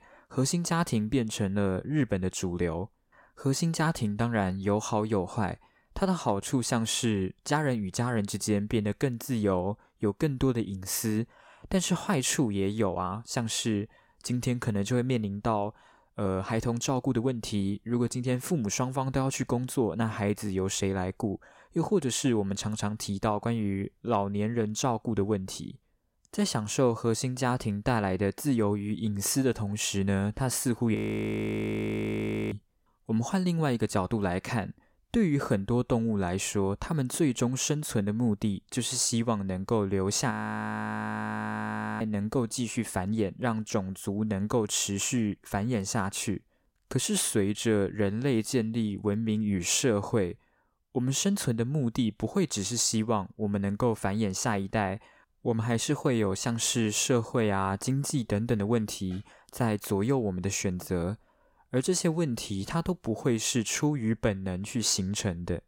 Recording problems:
audio freezing; at 31 s for 1.5 s and at 40 s for 1.5 s

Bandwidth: 16.5 kHz